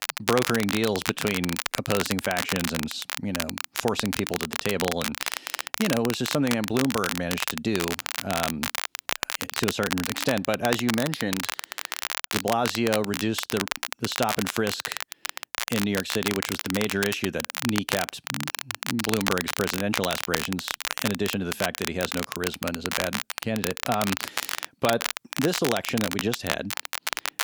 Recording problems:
crackle, like an old record; loud; 2 dB below the speech

